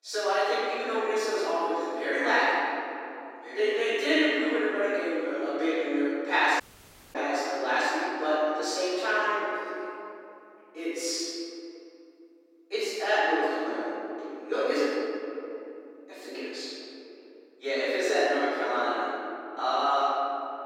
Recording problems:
room echo; strong; dies away in 3 s
off-mic speech; far
thin; somewhat; fading below 300 Hz
audio cutting out; at 6.5 s for 0.5 s

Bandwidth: 16 kHz